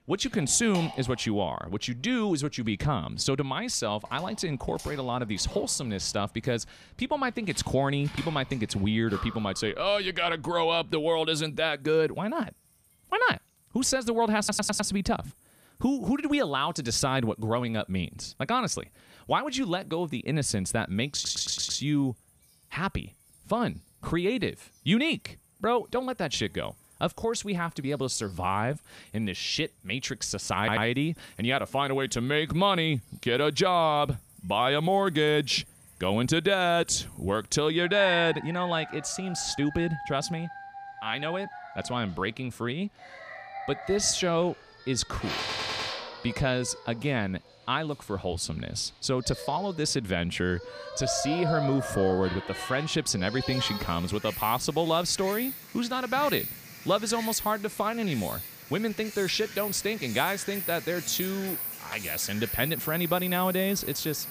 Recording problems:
animal sounds; loud; throughout; 9 dB below the speech
audio stuttering; 4 times, first at 14 s

